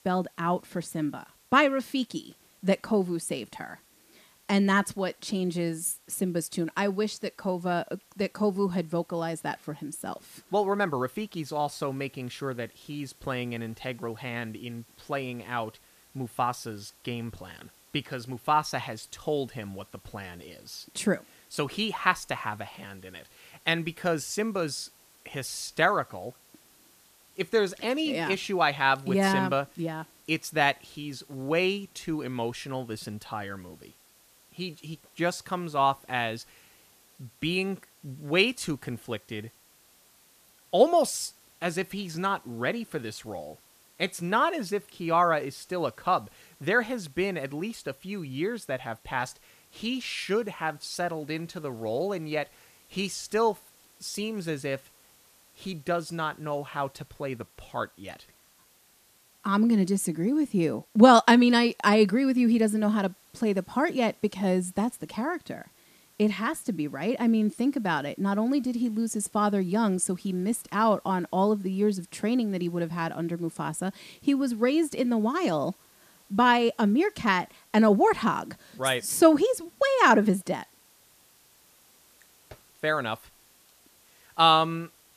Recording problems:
hiss; faint; throughout; 30 dB below the speech

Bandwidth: 14.5 kHz